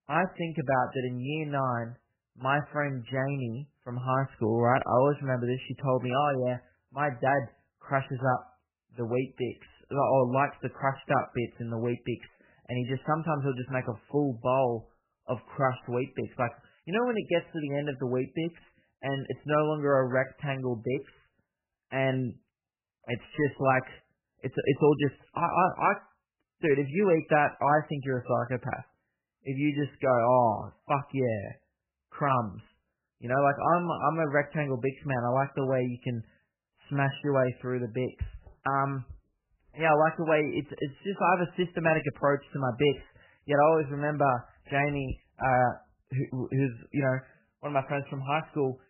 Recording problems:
garbled, watery; badly; nothing above 3 kHz

